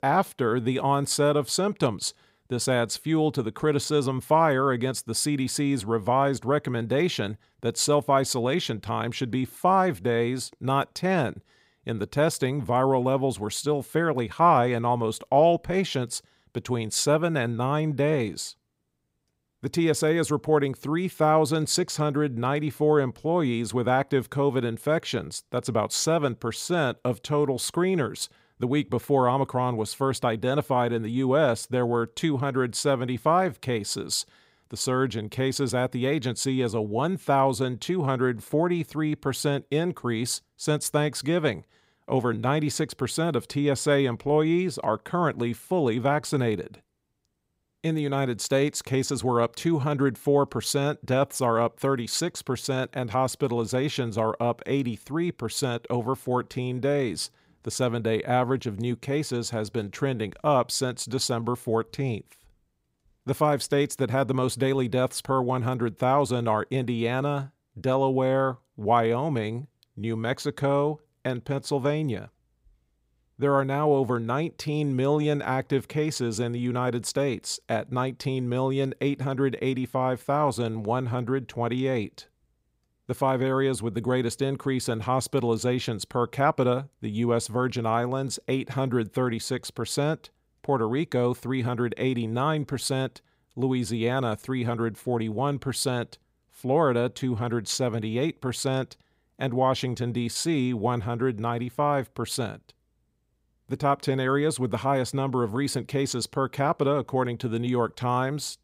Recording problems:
none

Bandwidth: 15.5 kHz